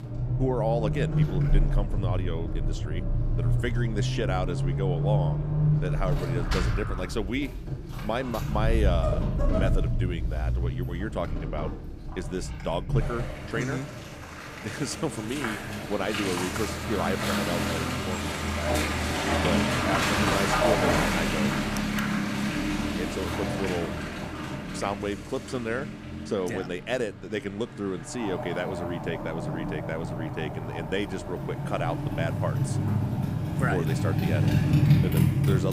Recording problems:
traffic noise; very loud; throughout; 5 dB above the speech
abrupt cut into speech; at the end

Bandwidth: 15 kHz